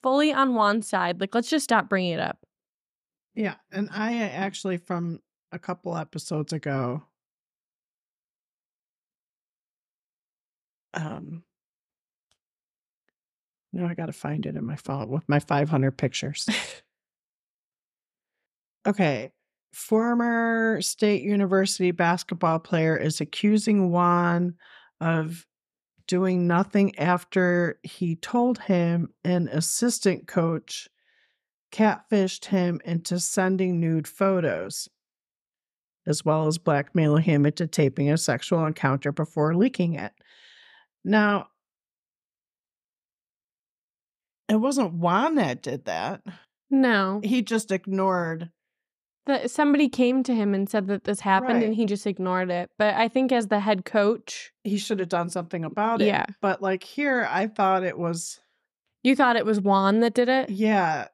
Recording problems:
none

